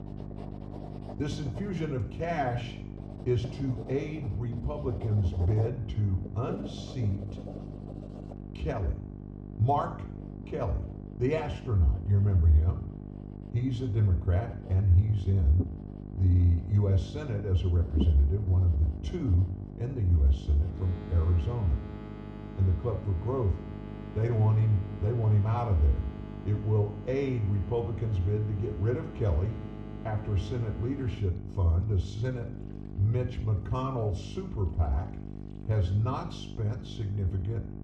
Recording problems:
muffled; slightly; fading above 1 kHz
room echo; slight; dies away in 0.6 s
off-mic speech; somewhat distant
electrical hum; noticeable; throughout; 50 Hz, 10 dB below the speech
household noises; noticeable; throughout; 15 dB below the speech

